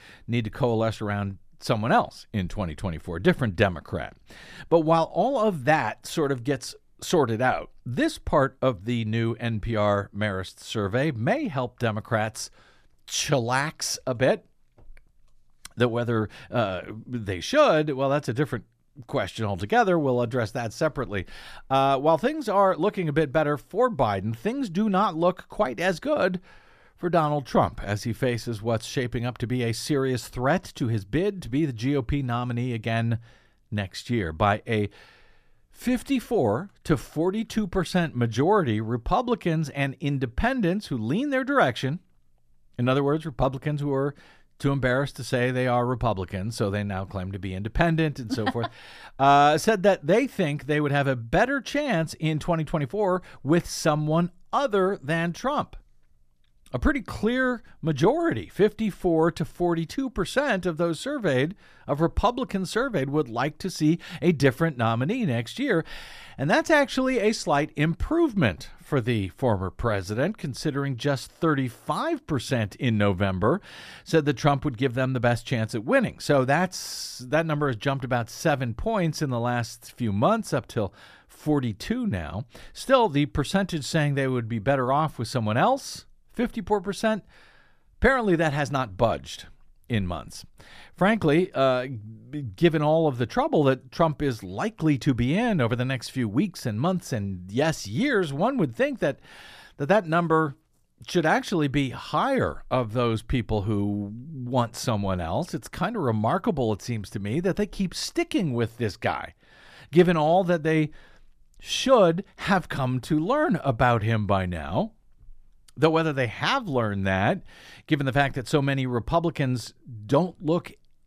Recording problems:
none

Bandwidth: 14.5 kHz